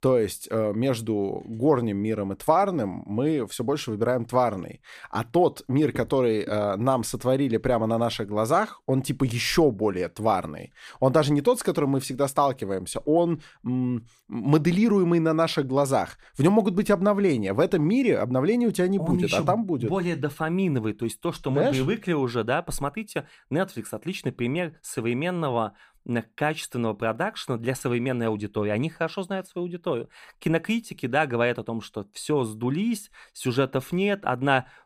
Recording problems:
none

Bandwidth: 15 kHz